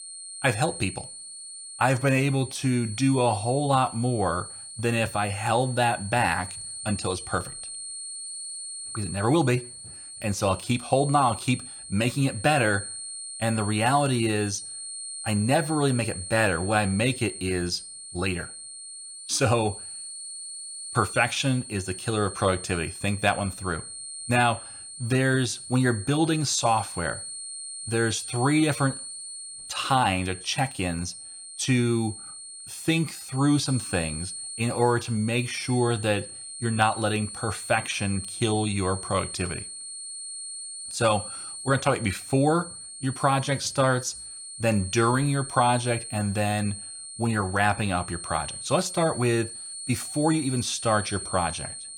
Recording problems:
high-pitched whine; loud; throughout; 9 kHz, 10 dB below the speech

